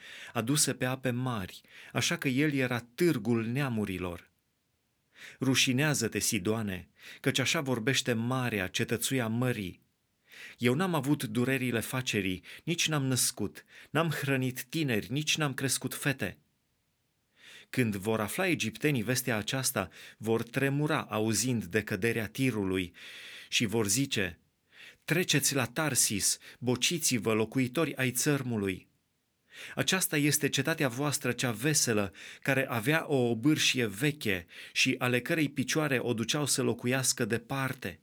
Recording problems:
audio stuttering; at 23 s

